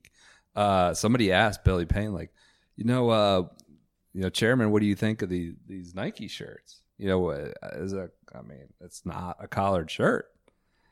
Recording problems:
none

